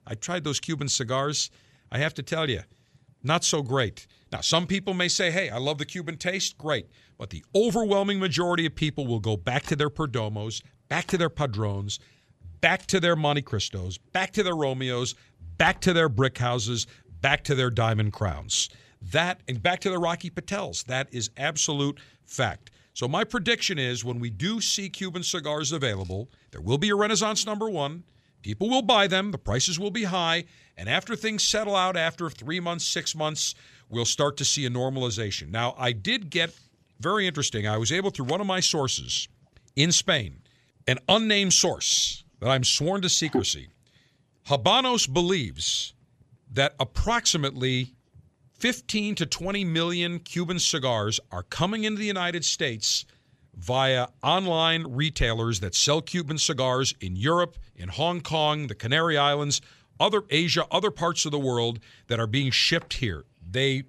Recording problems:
none

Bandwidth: 13.5 kHz